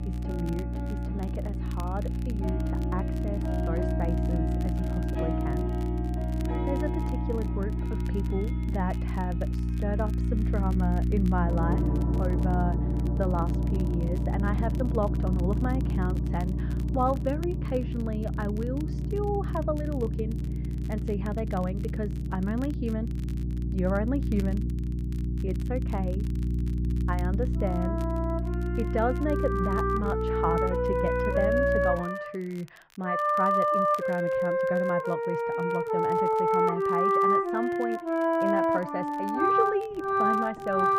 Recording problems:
muffled; very; fading above 1.5 kHz
background music; very loud; throughout; 3 dB above the speech
electrical hum; loud; until 32 s; 60 Hz, 8 dB below the speech
crackle, like an old record; faint; 20 dB below the speech

